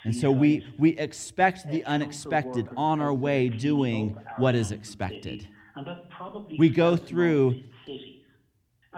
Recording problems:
voice in the background; noticeable; throughout; 15 dB below the speech

